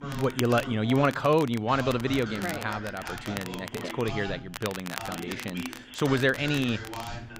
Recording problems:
voice in the background; noticeable; throughout; 10 dB below the speech
crackle, like an old record; noticeable; 15 dB below the speech

